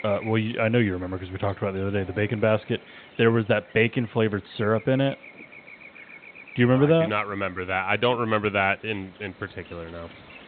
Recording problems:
high frequencies cut off; severe; nothing above 4 kHz
electrical hum; faint; throughout; 50 Hz, 20 dB below the speech

